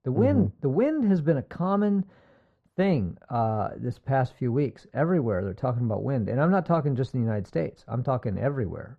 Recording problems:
muffled; very; fading above 3.5 kHz

